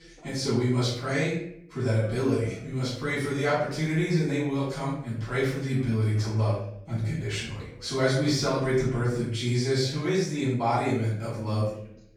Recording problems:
off-mic speech; far
room echo; noticeable; dies away in 0.6 s
voice in the background; faint; throughout; 25 dB below the speech

